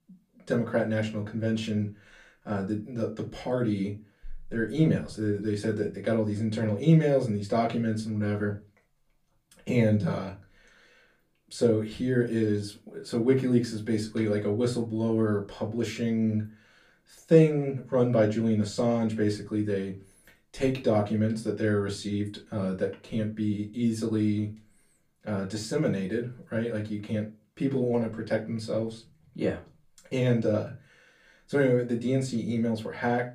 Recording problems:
off-mic speech; far
room echo; very slight; dies away in 0.2 s

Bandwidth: 15 kHz